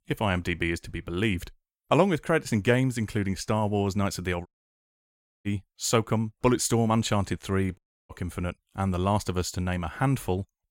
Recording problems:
audio cutting out; at 4.5 s for 1 s and at 8 s

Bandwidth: 16.5 kHz